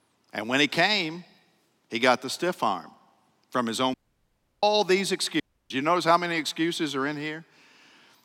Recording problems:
audio cutting out; at 4 s for 0.5 s and at 5.5 s

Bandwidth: 16.5 kHz